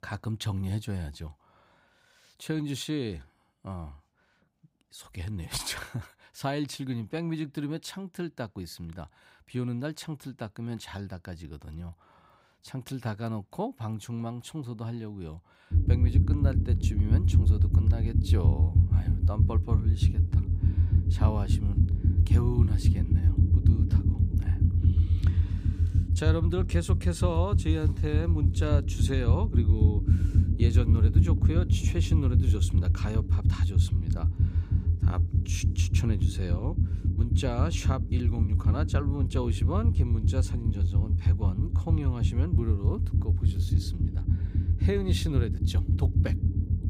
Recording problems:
low rumble; loud; from 16 s on; 3 dB below the speech

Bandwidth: 15.5 kHz